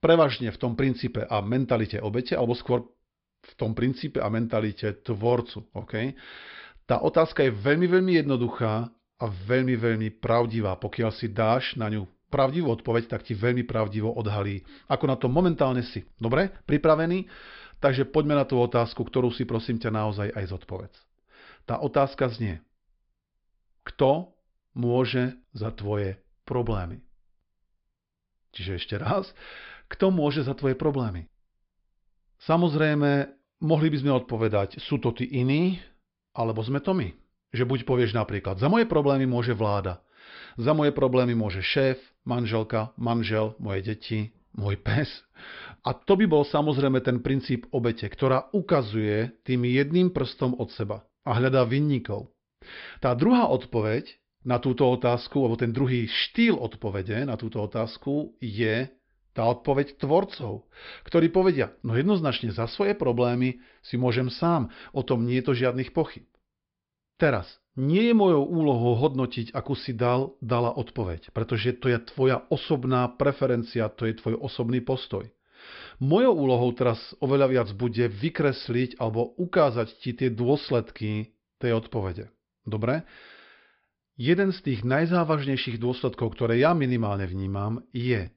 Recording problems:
high frequencies cut off; noticeable; nothing above 5 kHz

